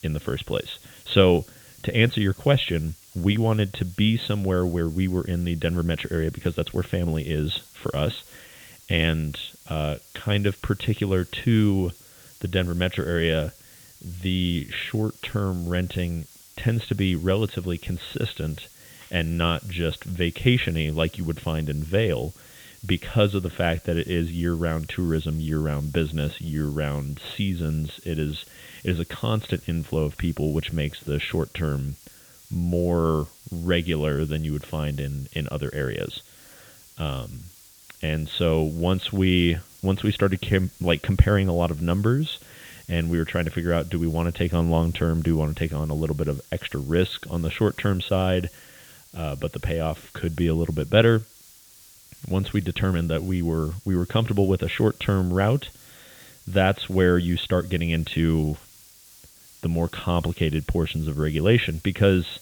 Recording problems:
high frequencies cut off; severe; nothing above 4 kHz
hiss; faint; throughout; 25 dB below the speech

